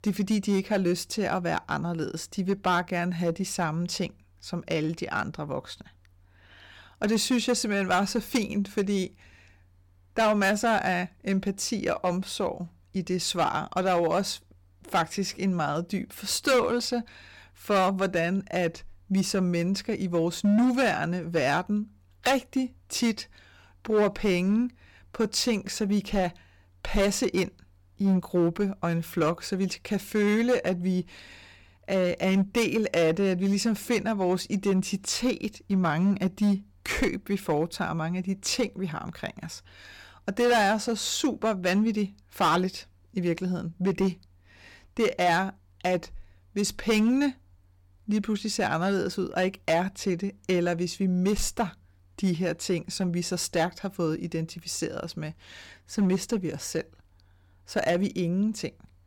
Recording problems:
distortion; slight; 4% of the sound clipped

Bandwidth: 18 kHz